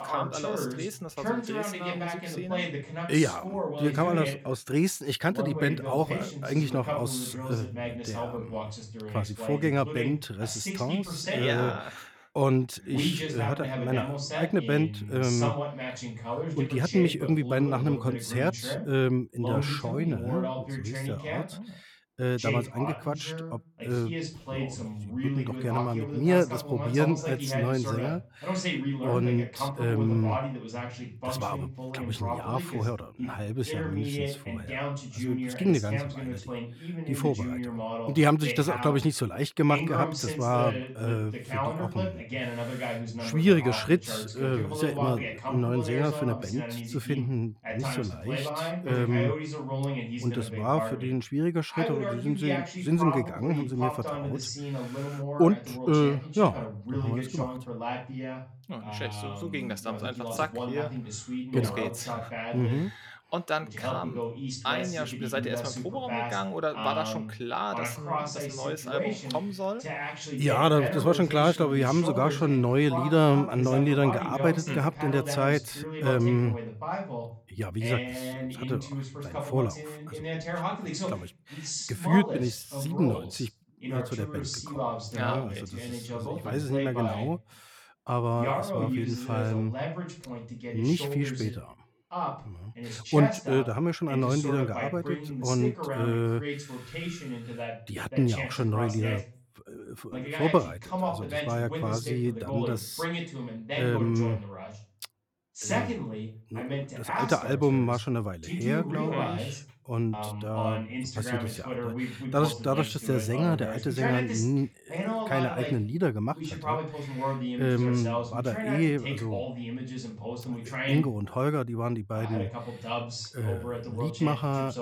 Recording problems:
voice in the background; loud; throughout; 5 dB below the speech

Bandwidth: 17.5 kHz